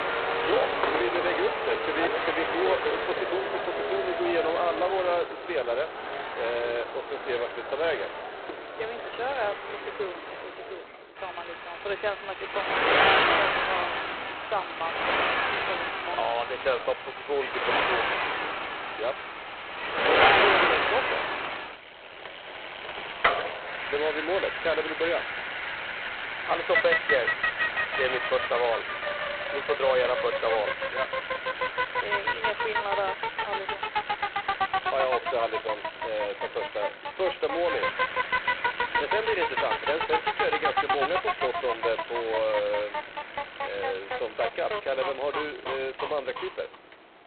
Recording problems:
phone-call audio; poor line; nothing above 4 kHz
traffic noise; very loud; throughout; 2 dB above the speech

